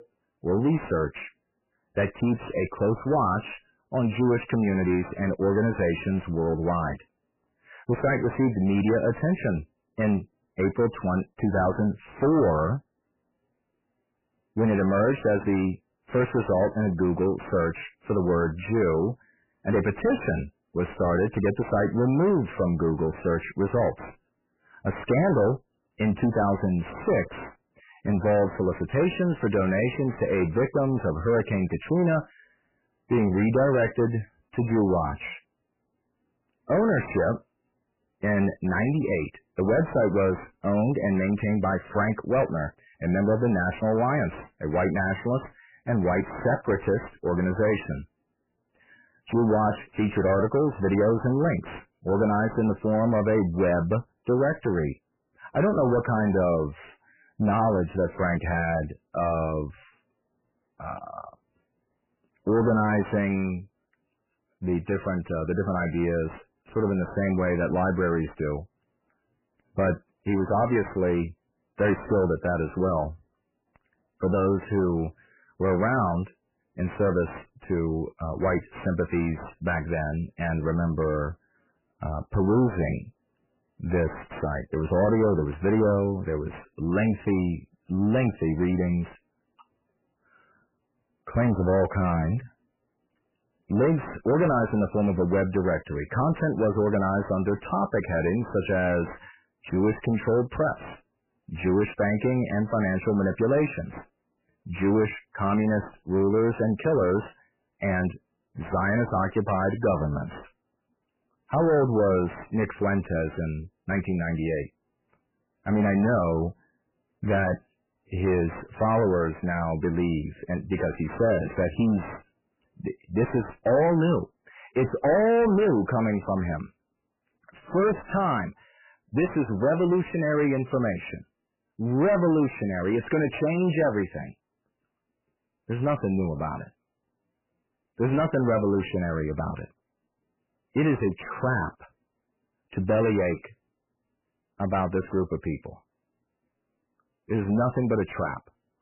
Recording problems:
distortion; heavy; 5 dB below the speech
garbled, watery; badly; nothing above 3 kHz

